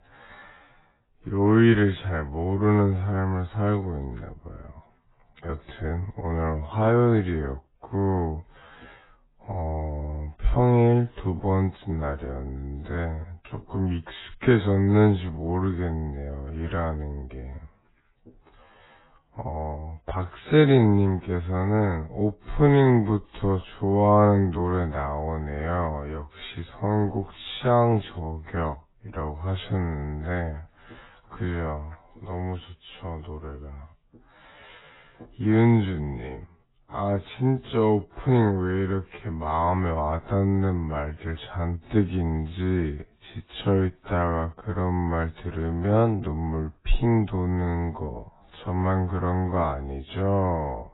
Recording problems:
garbled, watery; badly; nothing above 4 kHz
wrong speed, natural pitch; too slow; 0.5 times normal speed

